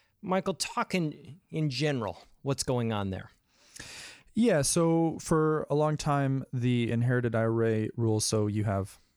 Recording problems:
none

